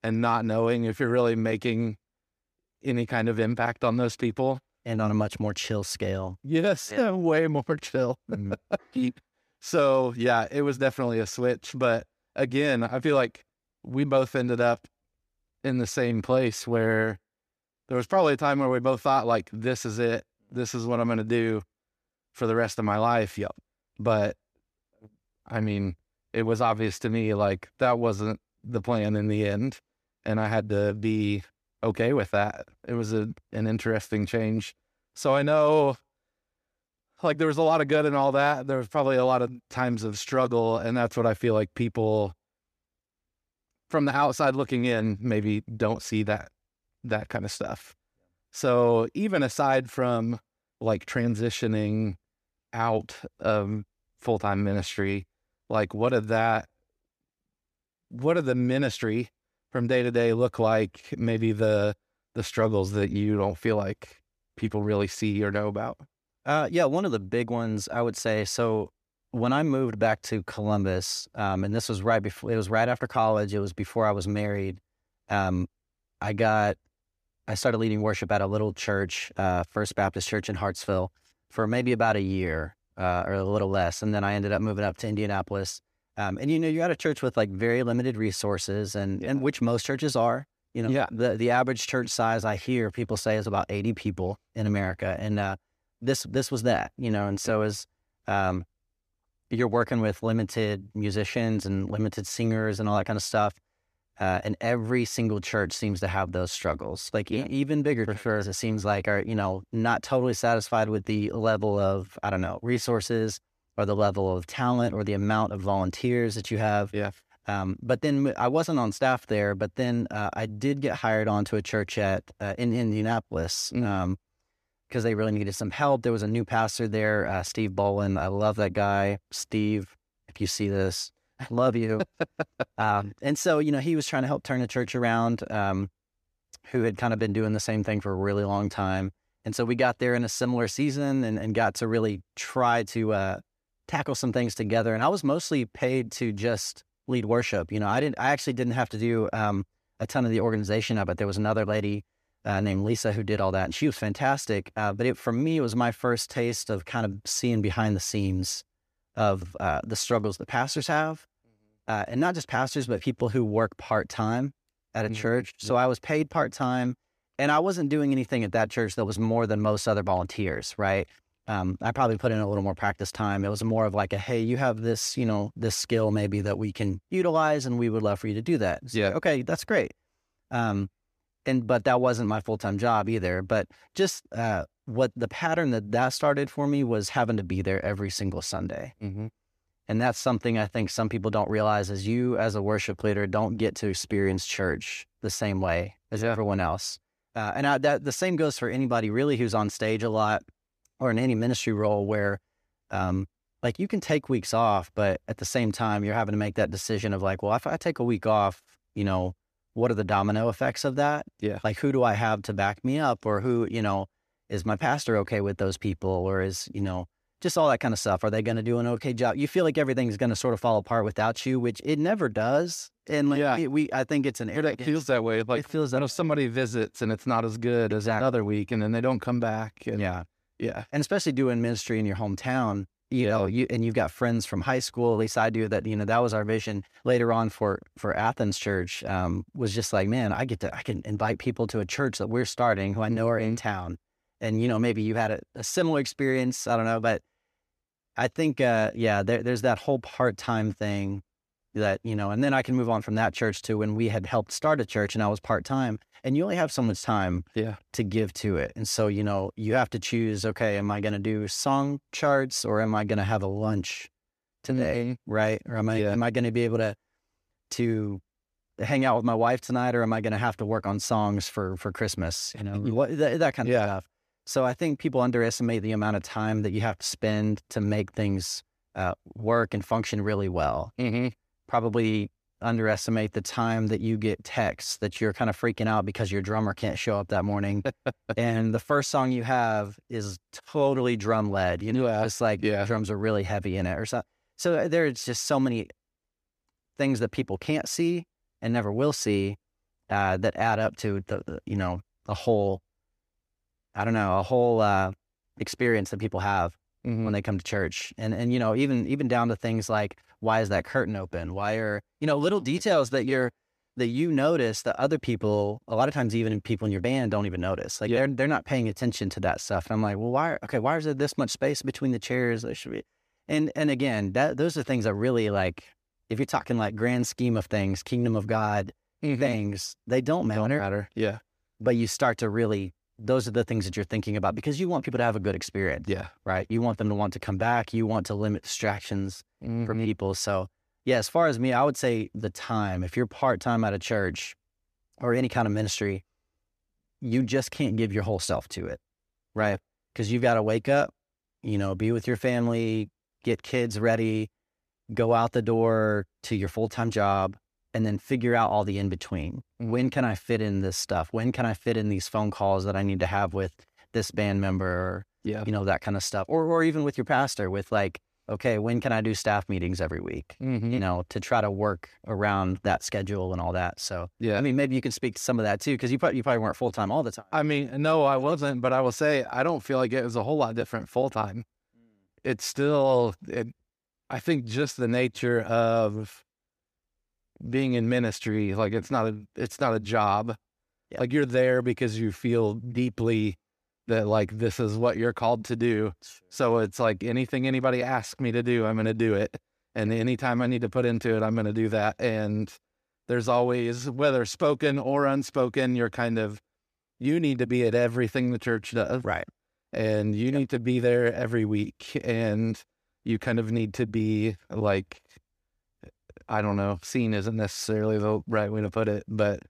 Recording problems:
none

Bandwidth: 14.5 kHz